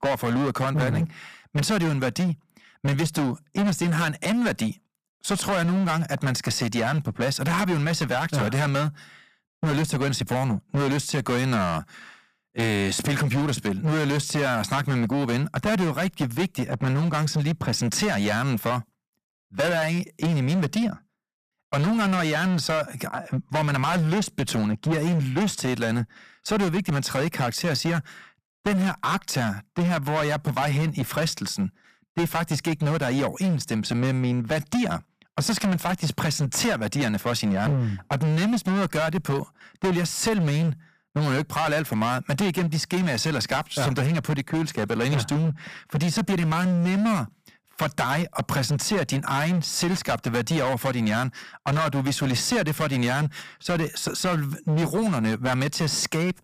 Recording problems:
distortion; heavy; 19% of the sound clipped

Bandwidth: 15 kHz